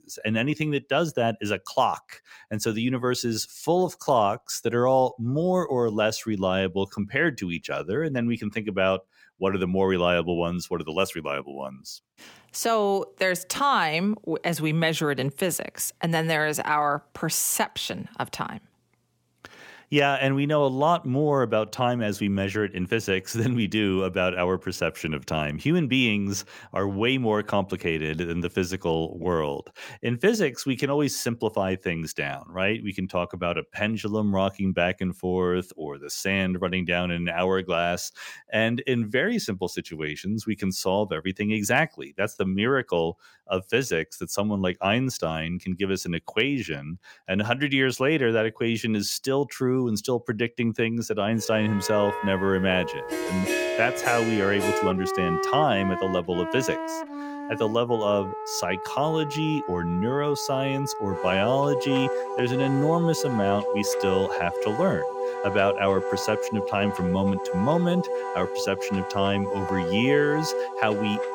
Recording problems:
background music; loud; from 52 s on; 5 dB below the speech

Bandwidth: 17 kHz